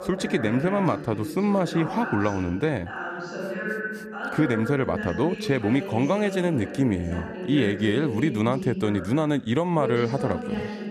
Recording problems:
voice in the background; loud; throughout; 7 dB below the speech

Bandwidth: 14.5 kHz